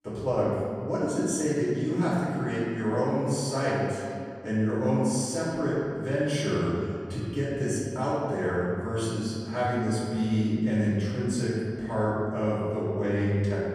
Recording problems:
room echo; strong; dies away in 2.1 s
off-mic speech; far

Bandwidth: 15 kHz